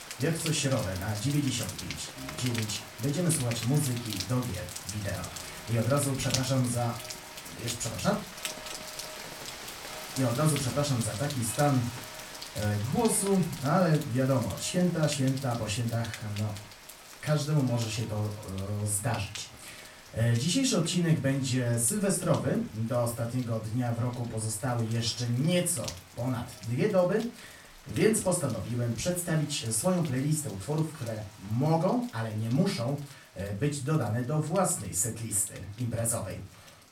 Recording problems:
off-mic speech; far
room echo; slight; dies away in 0.3 s
rain or running water; noticeable; throughout; 10 dB below the speech

